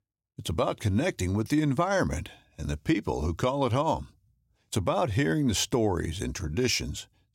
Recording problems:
none

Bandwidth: 16 kHz